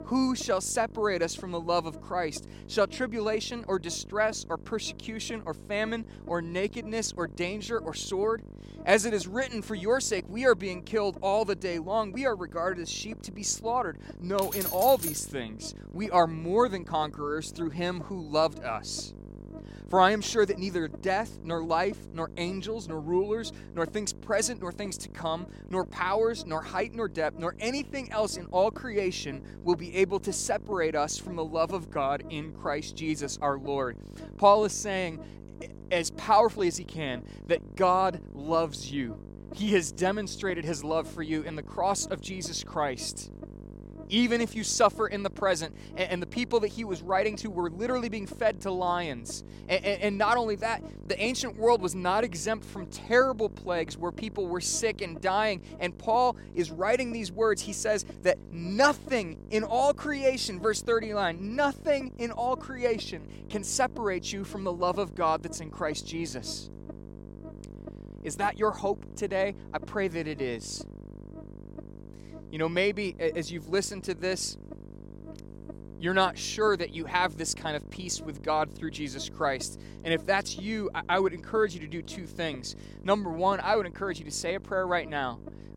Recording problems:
electrical hum; faint; throughout; 50 Hz, 20 dB below the speech
jangling keys; noticeable; at 14 s; peak 2 dB below the speech

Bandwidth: 16 kHz